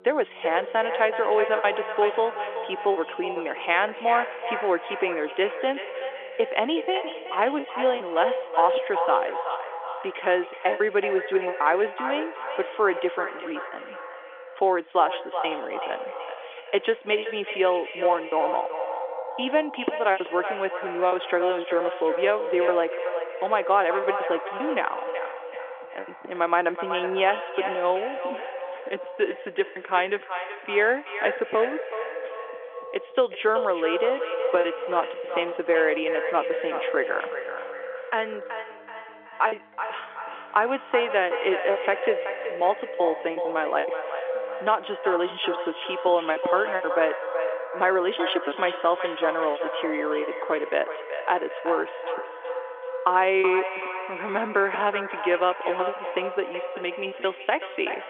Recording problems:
echo of what is said; strong; throughout; 380 ms later, 6 dB below the speech
phone-call audio; nothing above 3.5 kHz
background music; faint; throughout; 25 dB below the speech
choppy; very; 6% of the speech affected

